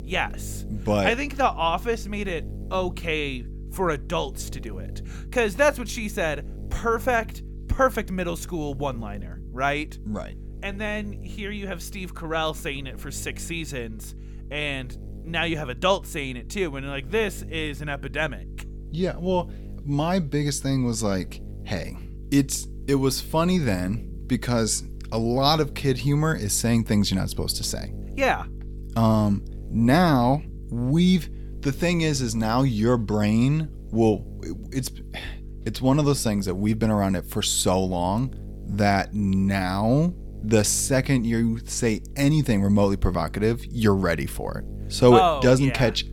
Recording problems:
electrical hum; faint; throughout; 50 Hz, 25 dB below the speech

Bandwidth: 17.5 kHz